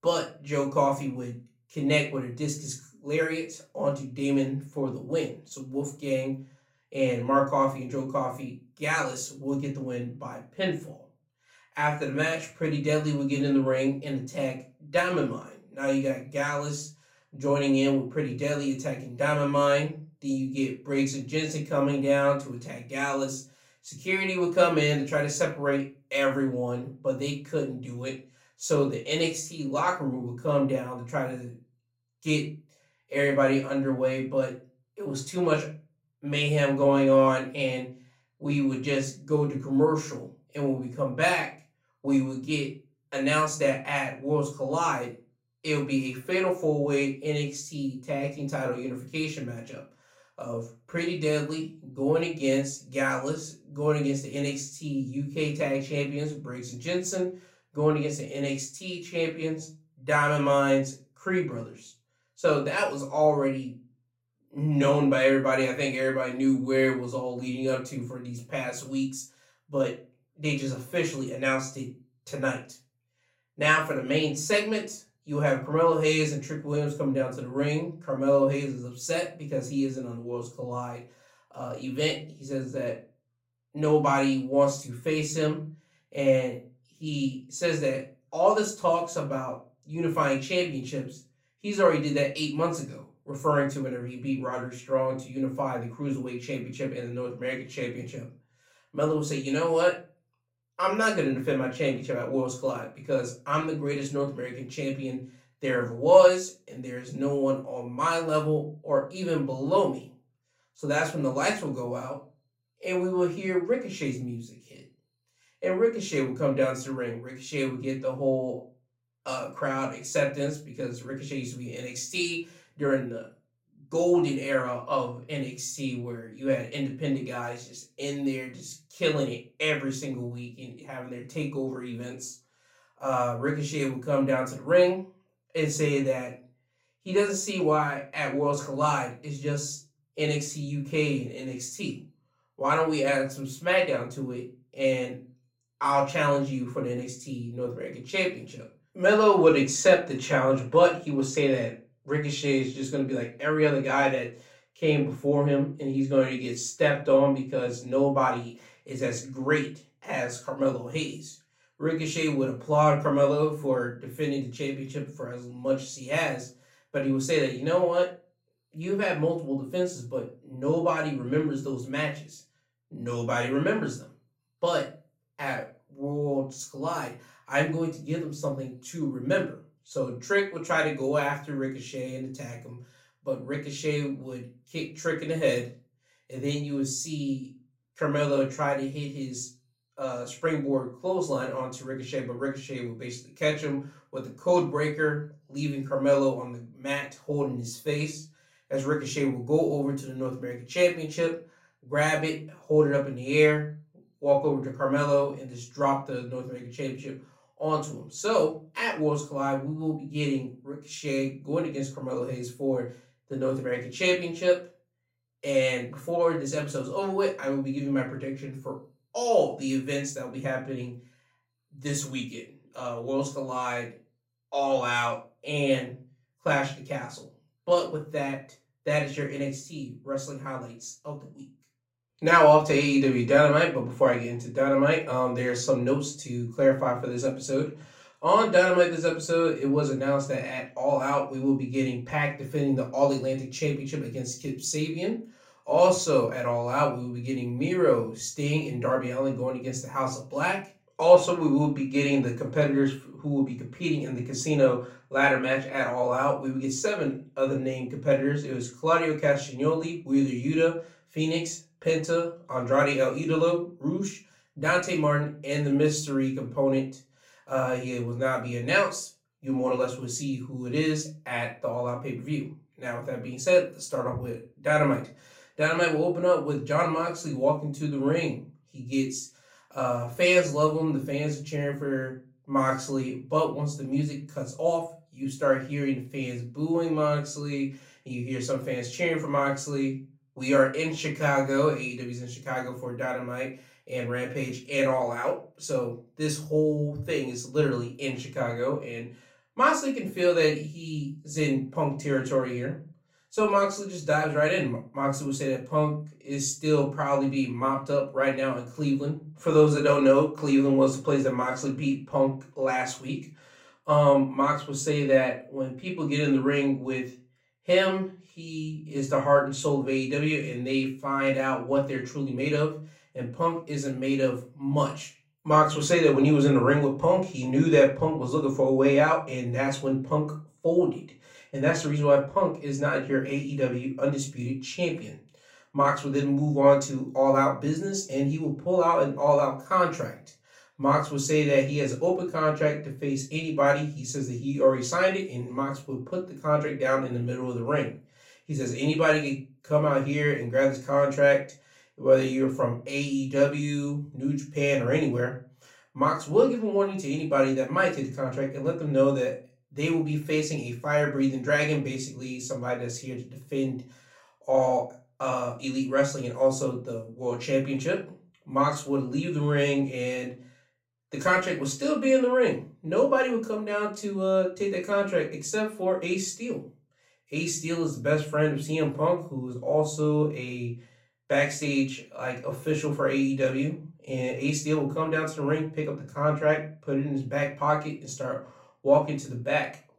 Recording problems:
off-mic speech; far
room echo; very slight; dies away in 0.3 s

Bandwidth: 16 kHz